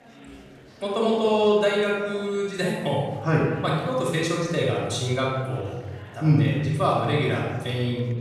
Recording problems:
off-mic speech; far
room echo; noticeable; dies away in 1.2 s
murmuring crowd; faint; throughout; 20 dB below the speech

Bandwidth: 14.5 kHz